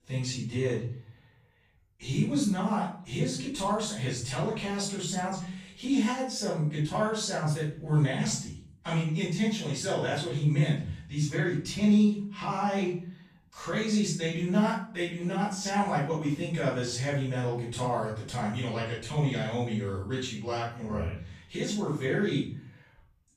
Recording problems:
off-mic speech; far
room echo; noticeable; dies away in 0.5 s

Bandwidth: 14.5 kHz